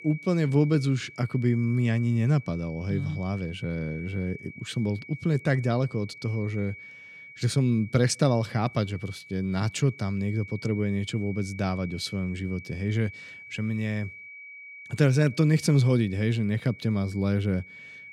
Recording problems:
high-pitched whine; noticeable; throughout; 2.5 kHz, 15 dB below the speech

